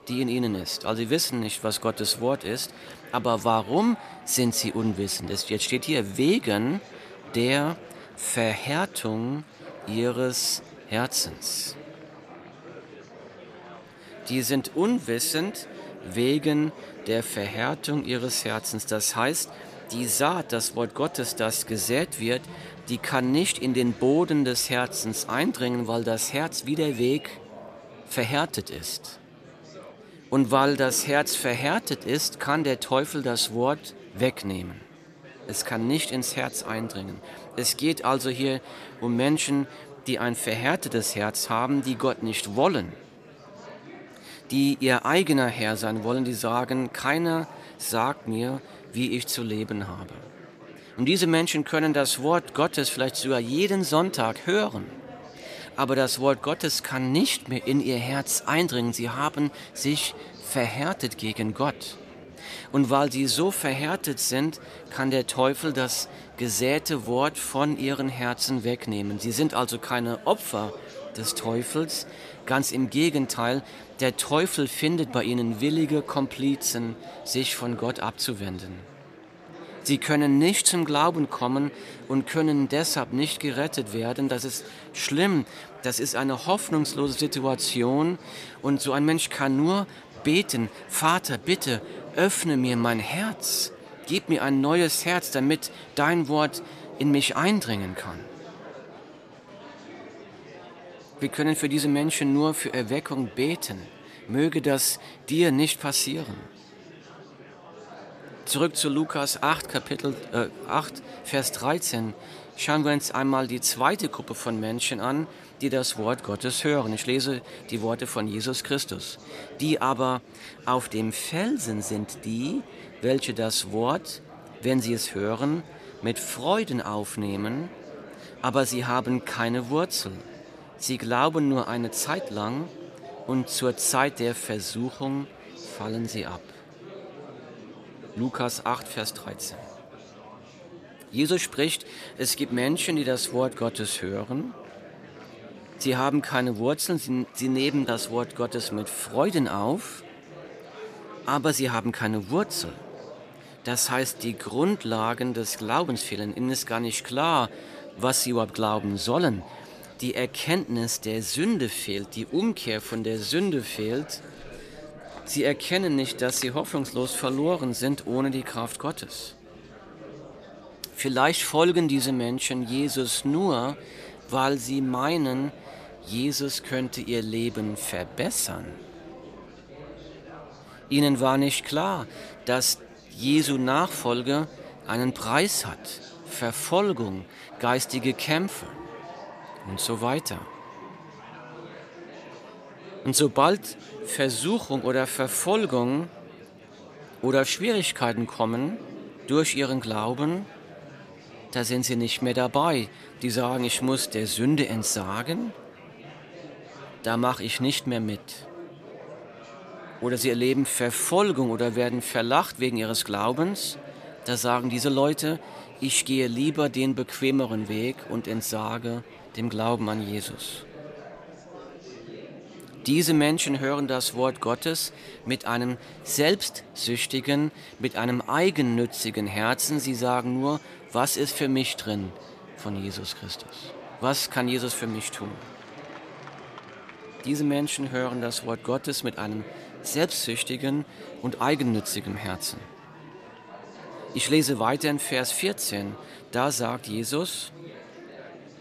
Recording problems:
murmuring crowd; noticeable; throughout; 20 dB below the speech

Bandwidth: 14.5 kHz